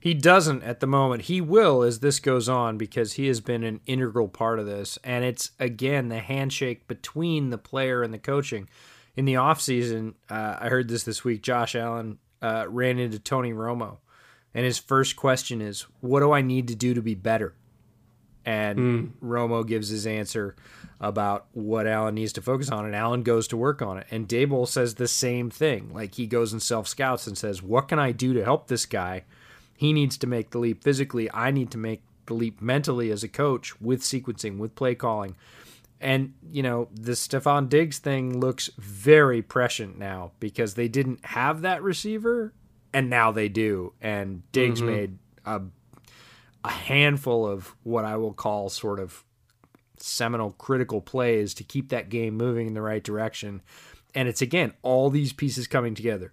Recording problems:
none

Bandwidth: 15 kHz